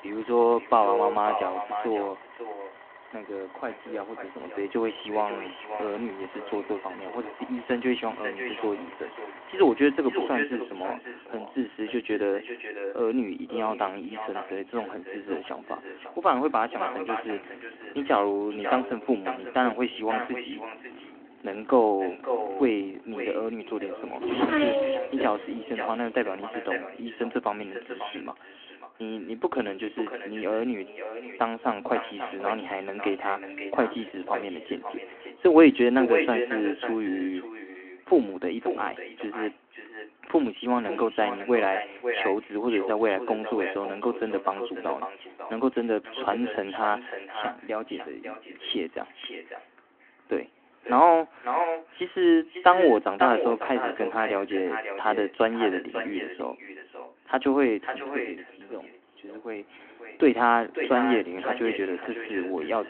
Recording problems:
echo of what is said; strong; throughout; 550 ms later, 8 dB below the speech
phone-call audio
traffic noise; noticeable; throughout; 10 dB below the speech

